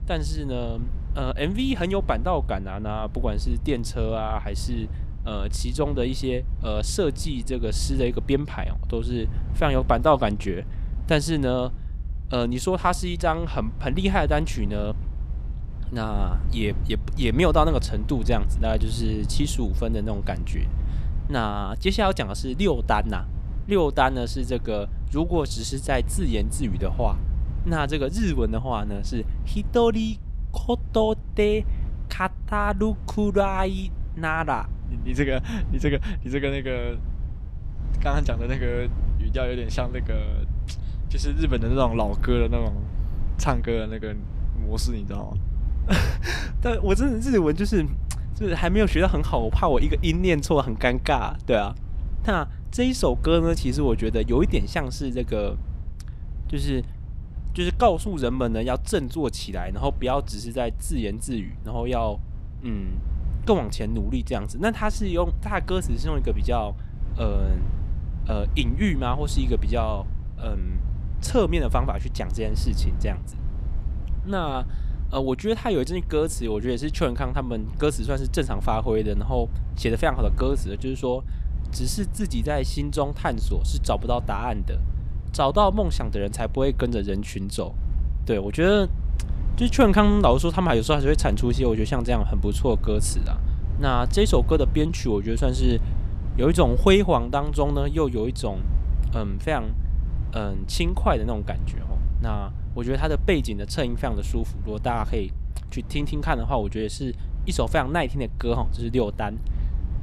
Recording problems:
low rumble; faint; throughout; 20 dB below the speech

